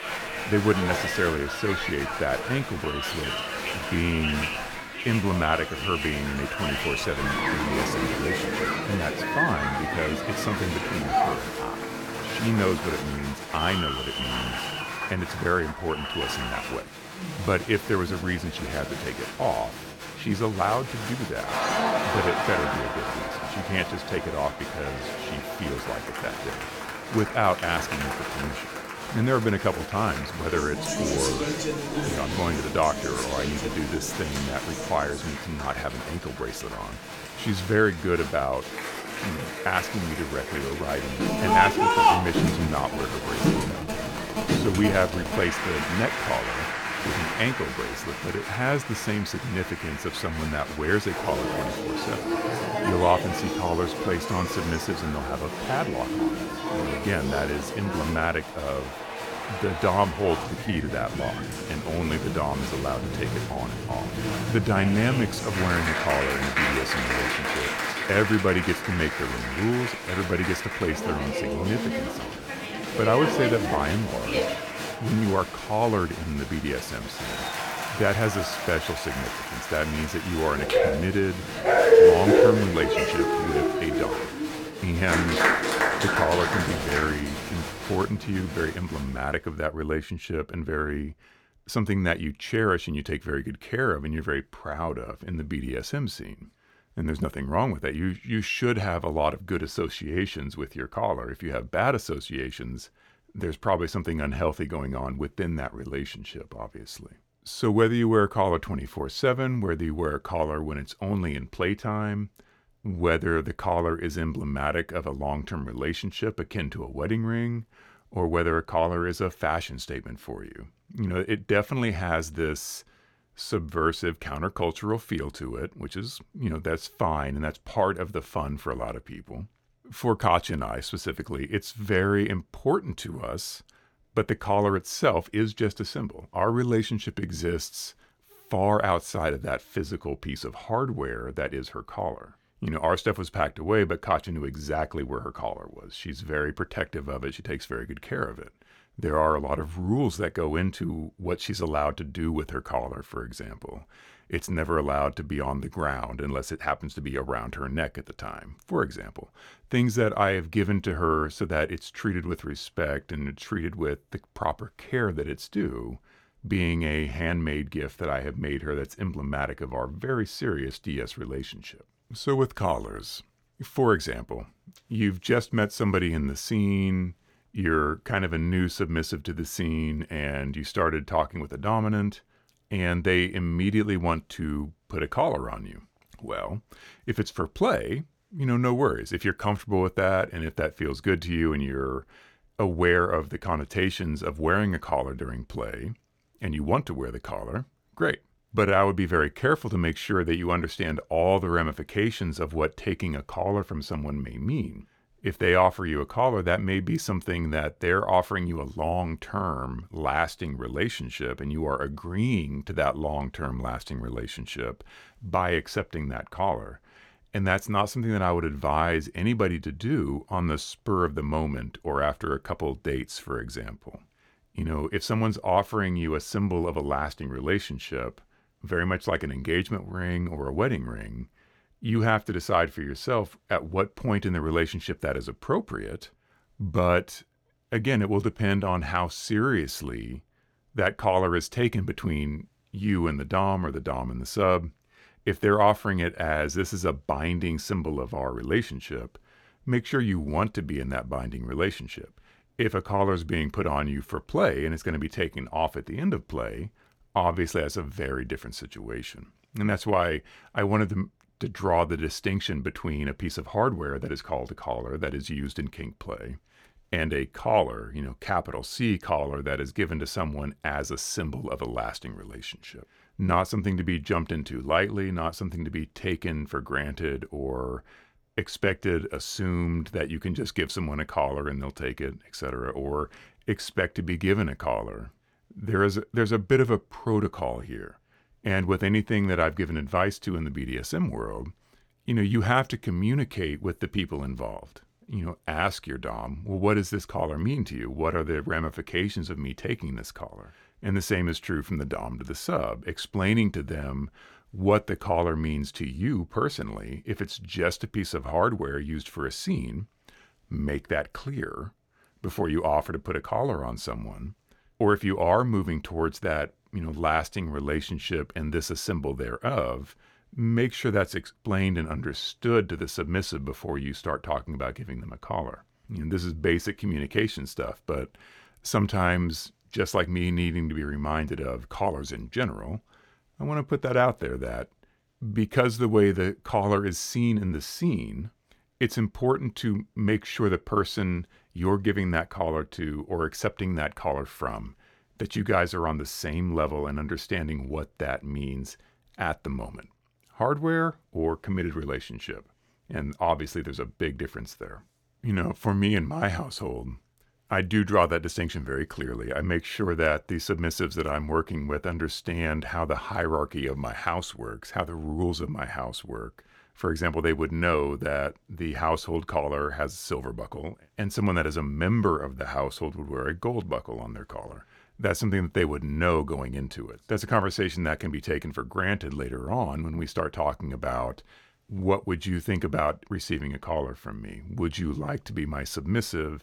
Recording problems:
crowd noise; loud; until 1:29; as loud as the speech

